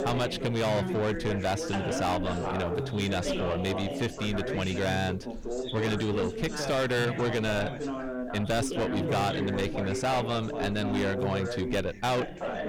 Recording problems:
distortion; heavy; 7 dB below the speech
background chatter; loud; throughout; 3 voices, 4 dB below the speech
electrical hum; faint; throughout; 60 Hz, 20 dB below the speech

